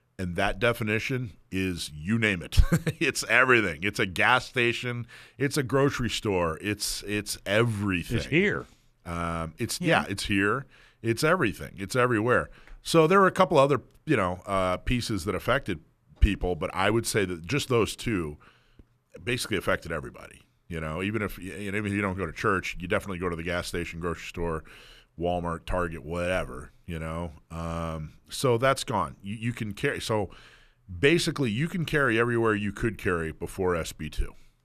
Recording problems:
none

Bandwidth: 14.5 kHz